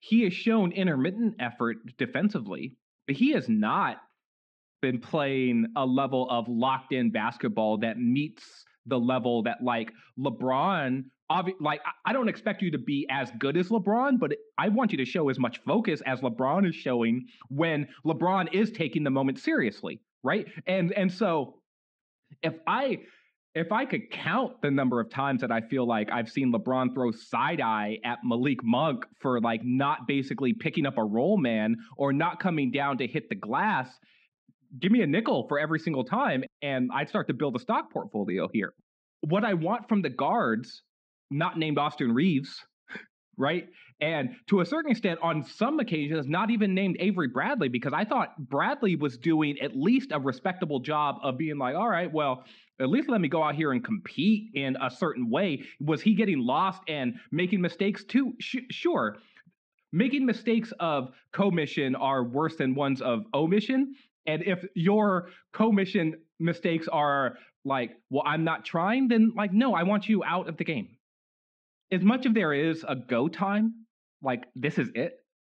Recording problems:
muffled; slightly; fading above 3.5 kHz

